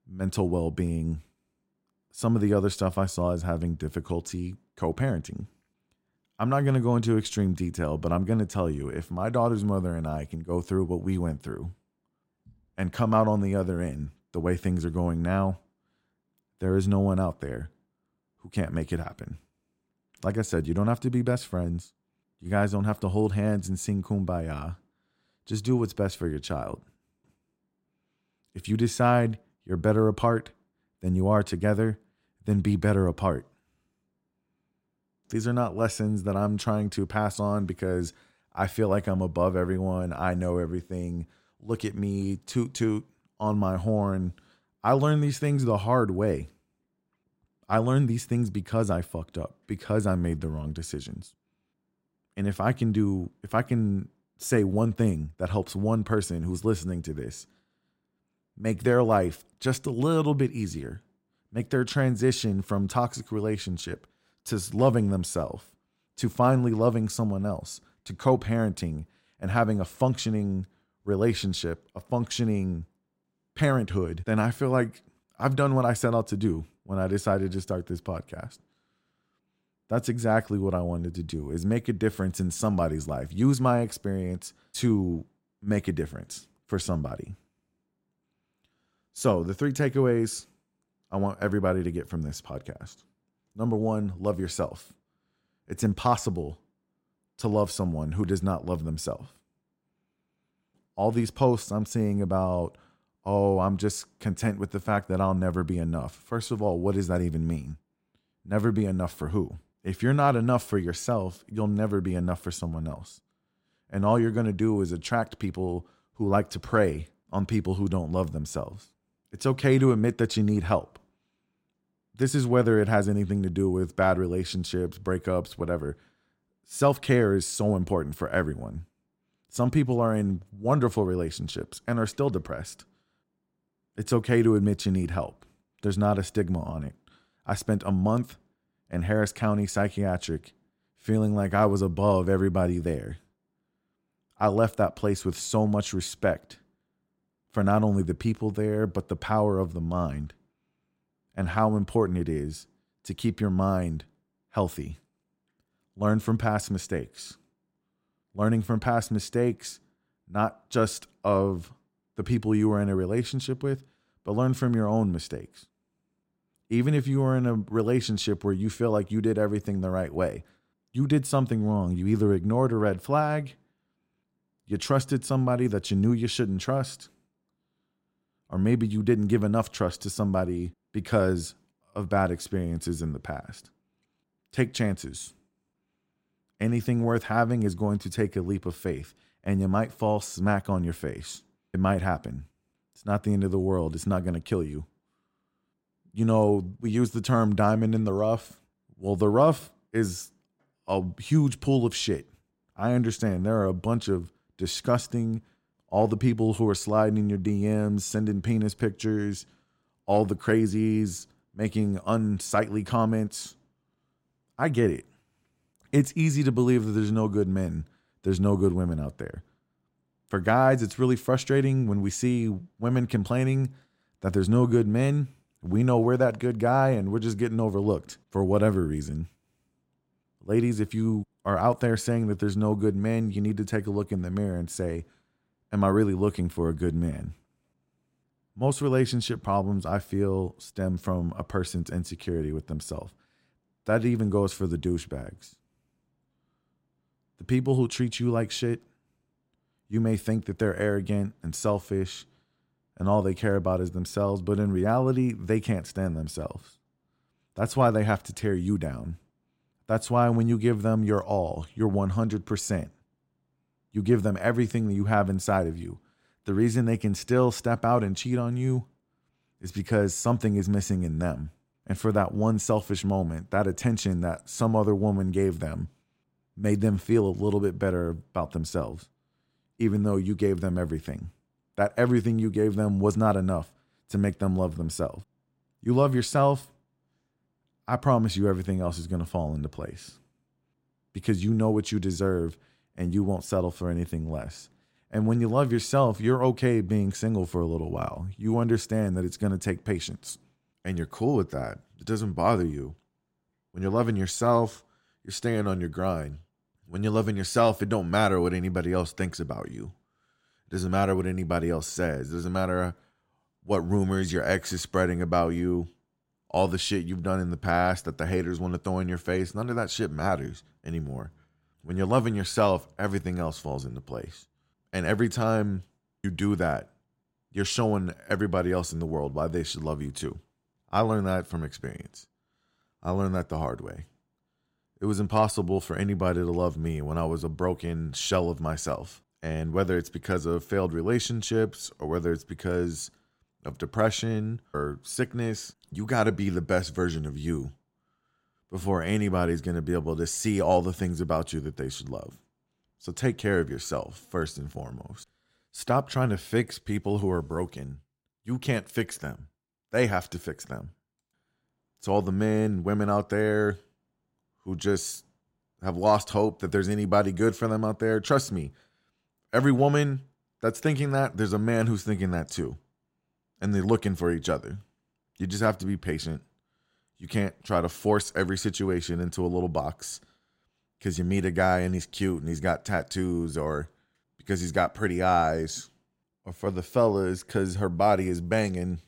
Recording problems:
none

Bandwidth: 16 kHz